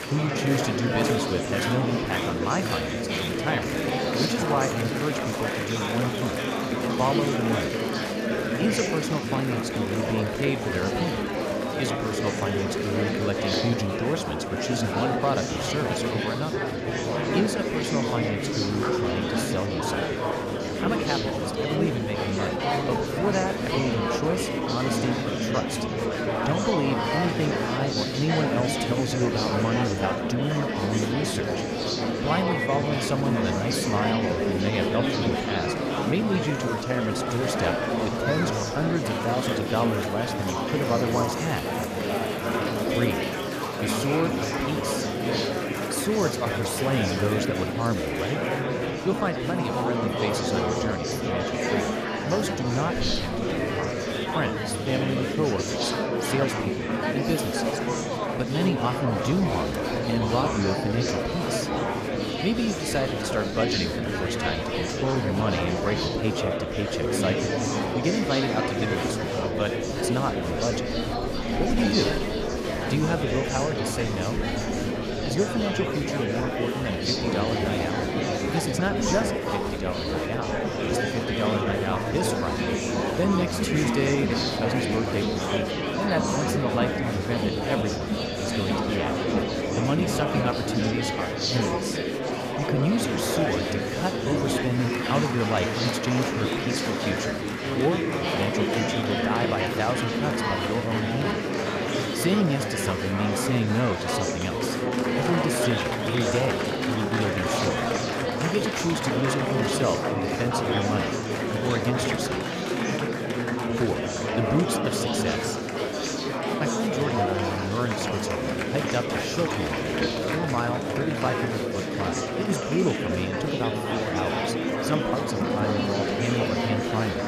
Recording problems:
murmuring crowd; very loud; throughout; 2 dB above the speech

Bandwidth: 14.5 kHz